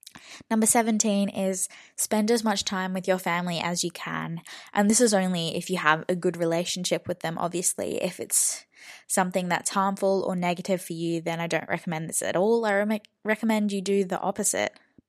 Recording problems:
none

